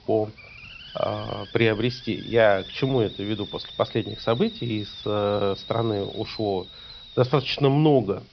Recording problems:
high frequencies cut off; noticeable; nothing above 5.5 kHz
hiss; noticeable; throughout; 15 dB below the speech

